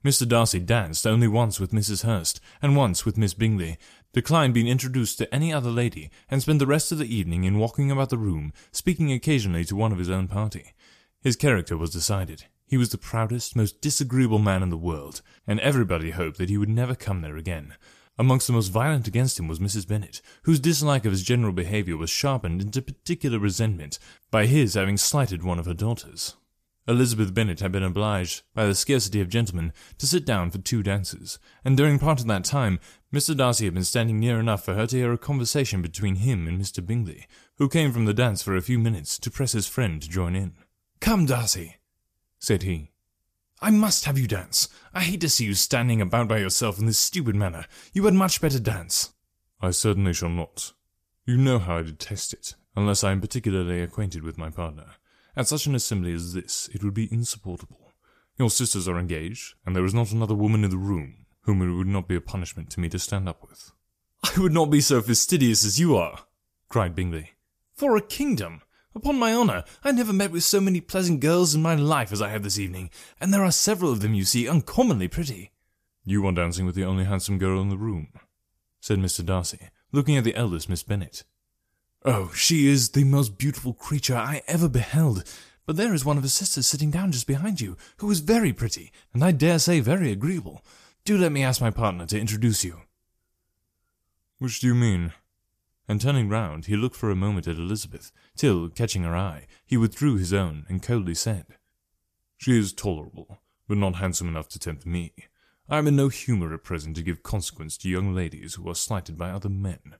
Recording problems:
none

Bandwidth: 14.5 kHz